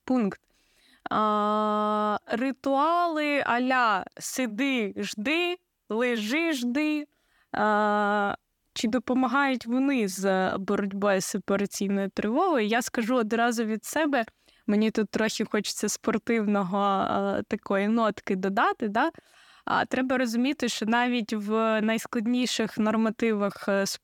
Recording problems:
none

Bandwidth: 17.5 kHz